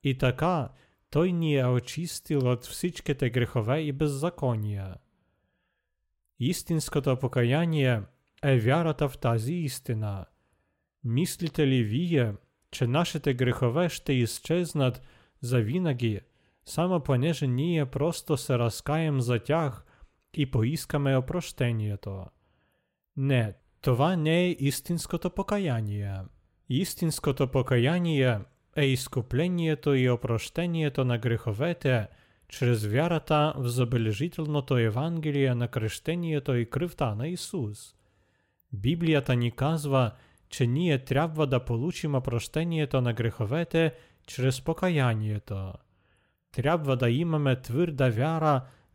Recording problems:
none

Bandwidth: 16 kHz